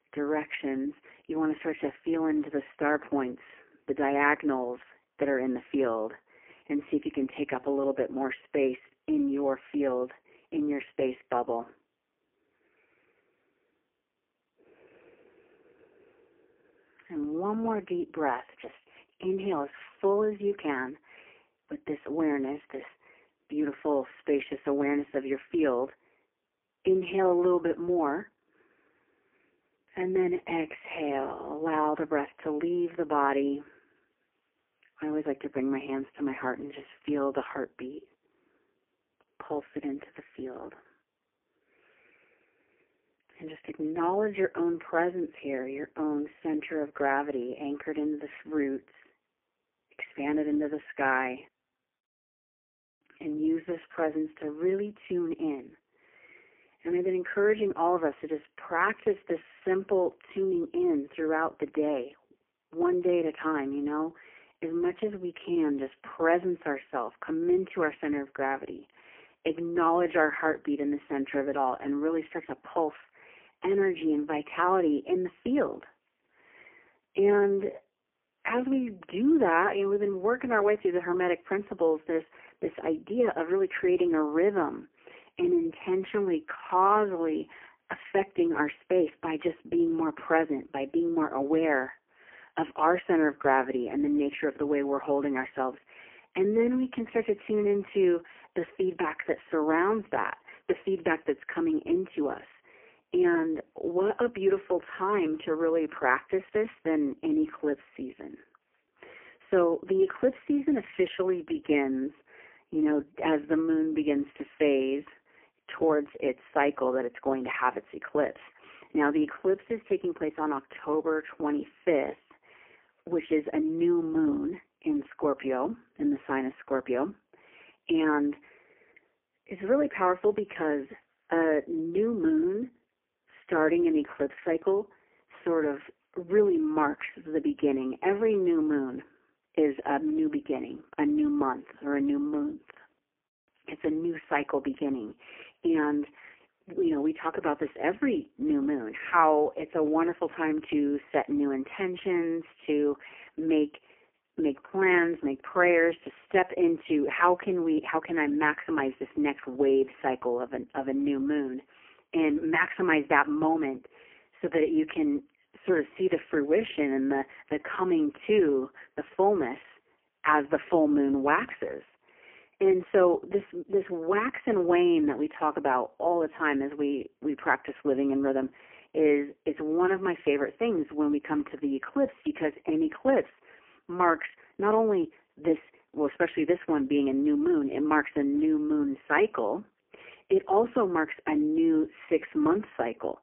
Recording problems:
phone-call audio; poor line; nothing above 3 kHz

